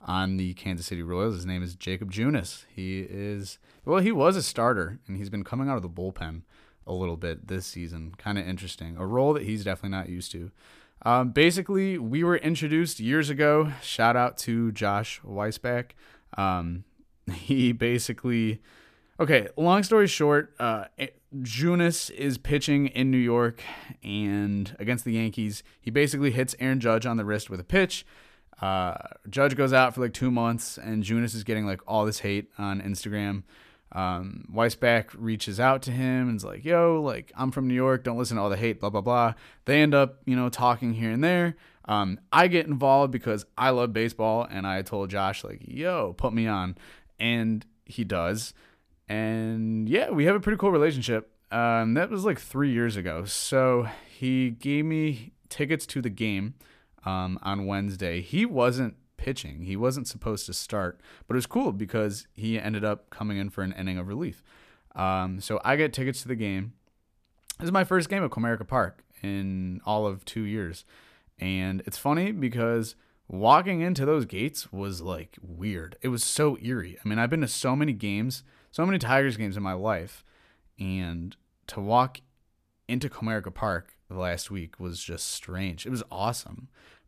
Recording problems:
none

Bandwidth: 14.5 kHz